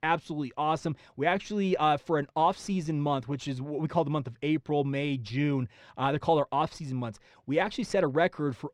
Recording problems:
muffled; very; fading above 4 kHz

